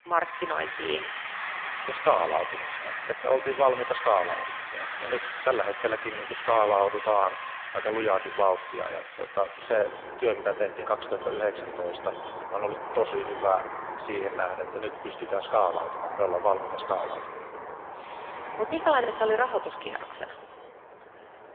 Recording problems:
phone-call audio; poor line
echo of what is said; noticeable; throughout; 100 ms later, 15 dB below the speech
traffic noise; loud; throughout; 9 dB below the speech
choppy; occasionally; at 4.5 s and at 19 s; 1% of the speech affected

